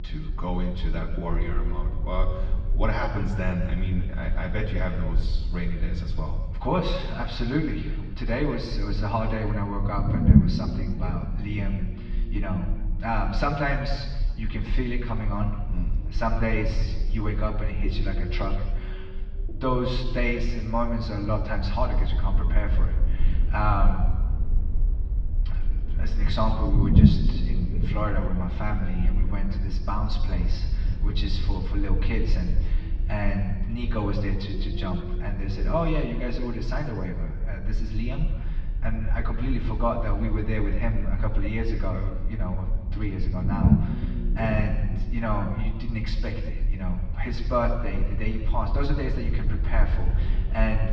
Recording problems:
off-mic speech; far
room echo; noticeable; dies away in 1.3 s
muffled; very slightly; fading above 4.5 kHz
low rumble; loud; throughout; 9 dB below the speech

